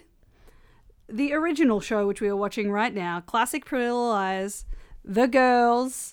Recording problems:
none

